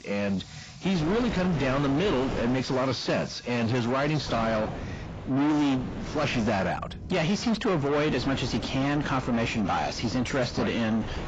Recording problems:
distortion; heavy; 7 dB below the speech
garbled, watery; badly; nothing above 7.5 kHz
rain or running water; noticeable; throughout; 20 dB below the speech
wind noise on the microphone; occasional gusts; from 1 to 2.5 s, from 4.5 to 6.5 s and from 8 s on; 10 dB below the speech

